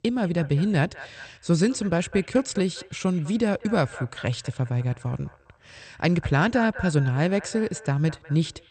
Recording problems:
echo of what is said; noticeable; throughout; 200 ms later, 20 dB below the speech
garbled, watery; slightly; nothing above 8.5 kHz

